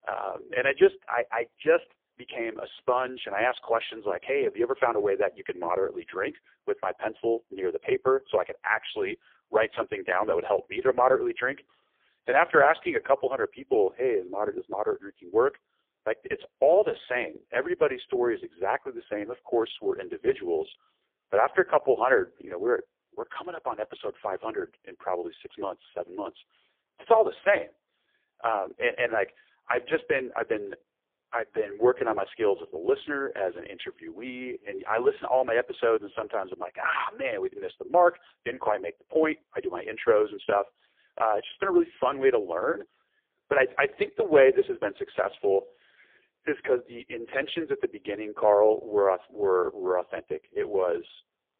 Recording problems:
phone-call audio; poor line

